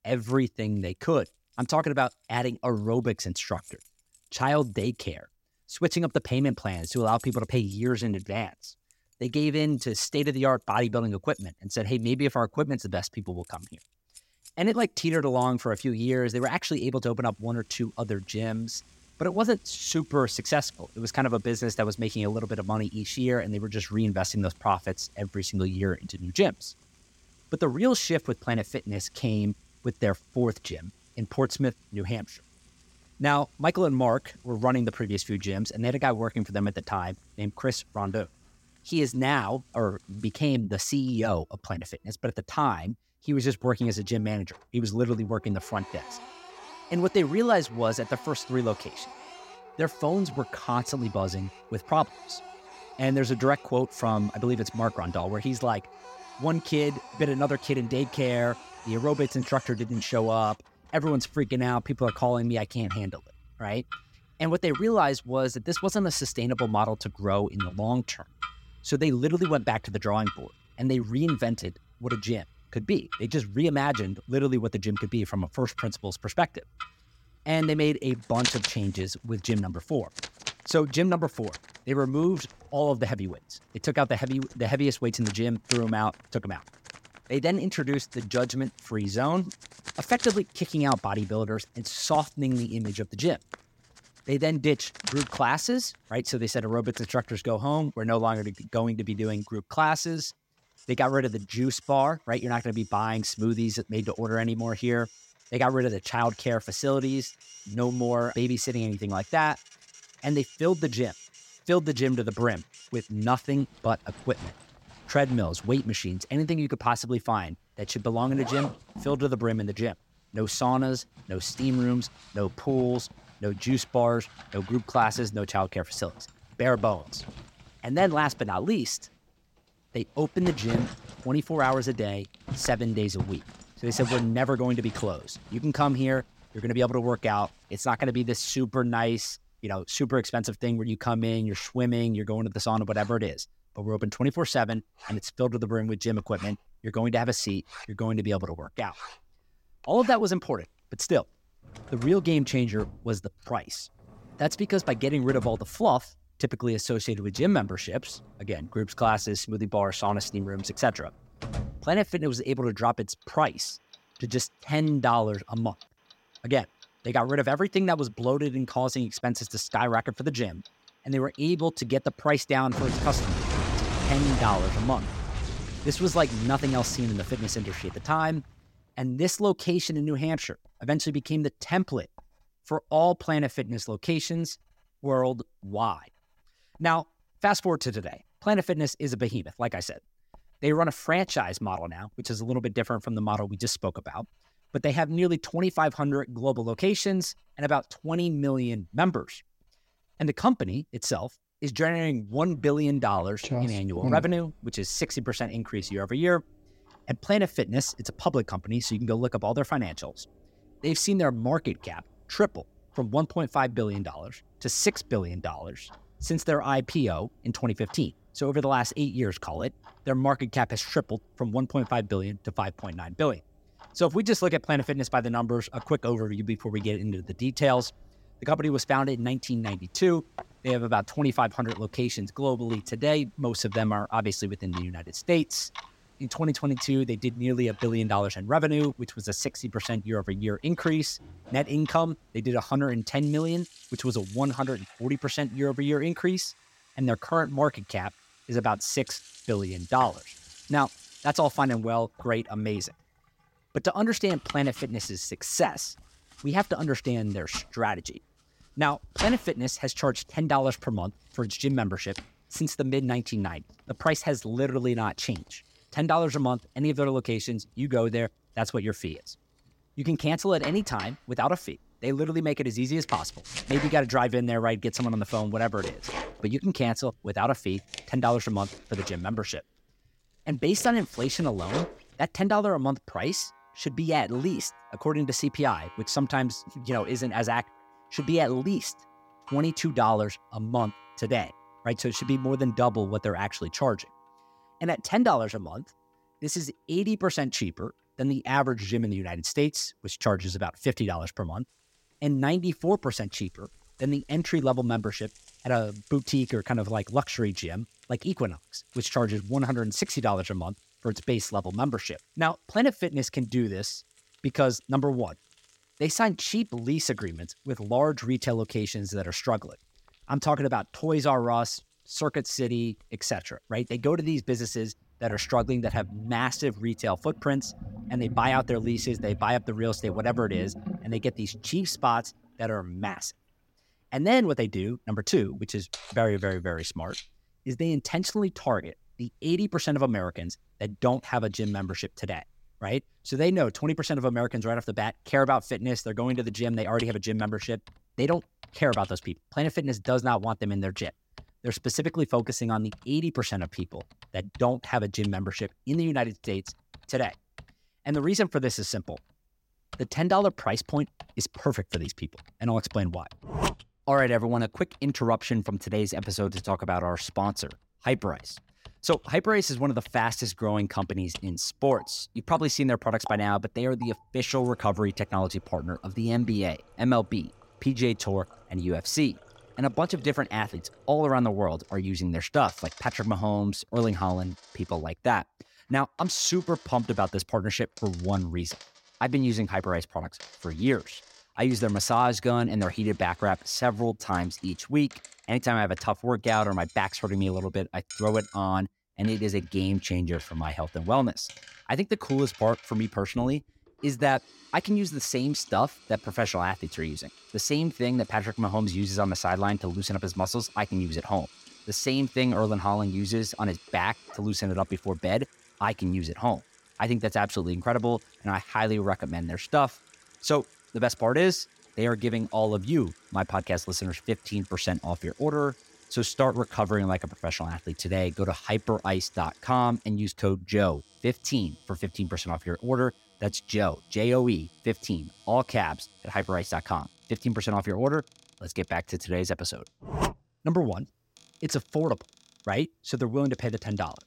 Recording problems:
household noises; noticeable; throughout; 15 dB below the speech

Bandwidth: 16 kHz